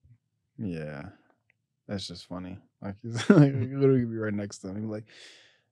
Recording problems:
none

